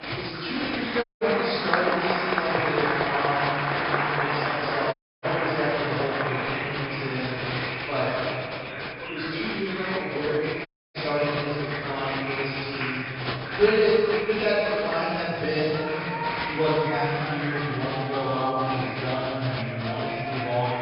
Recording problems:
room echo; strong; dies away in 2.1 s
off-mic speech; far
high frequencies cut off; noticeable; nothing above 5.5 kHz
crowd noise; loud; throughout; 2 dB below the speech
background chatter; loud; throughout; 4 voices, 8 dB below the speech
audio cutting out; at 1 s, at 5 s and at 11 s

